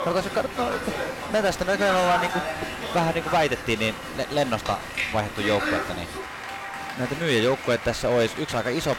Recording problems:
distortion; slight; 6% of the sound clipped
crowd noise; loud; throughout; 6 dB below the speech

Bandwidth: 16.5 kHz